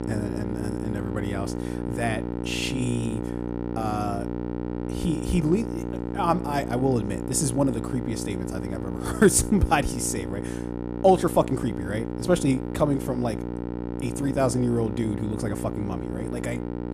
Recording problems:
electrical hum; loud; throughout; 60 Hz, 8 dB below the speech

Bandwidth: 14.5 kHz